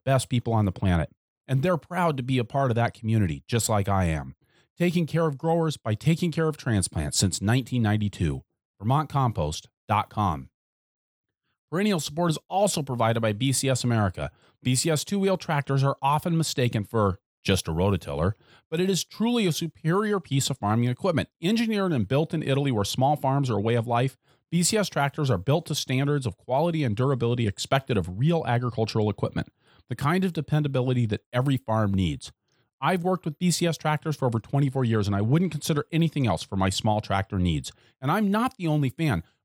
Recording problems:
none

